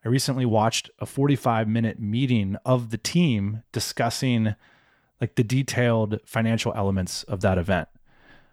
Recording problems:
none

